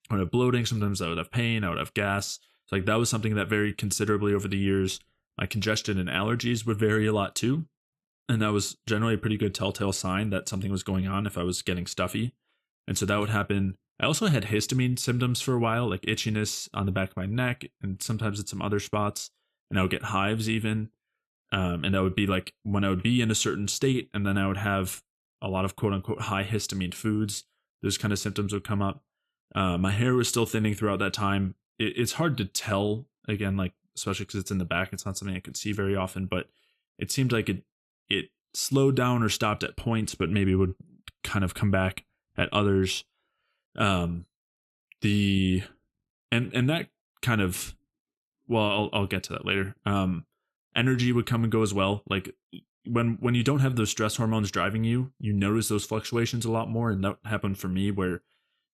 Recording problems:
none

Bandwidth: 13.5 kHz